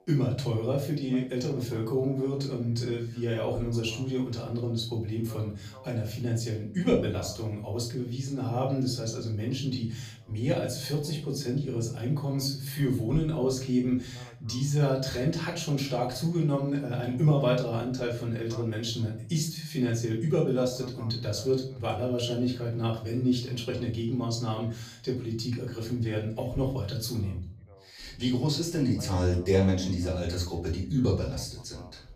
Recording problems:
off-mic speech; far
room echo; slight; dies away in 0.4 s
voice in the background; faint; throughout; 25 dB below the speech

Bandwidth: 14.5 kHz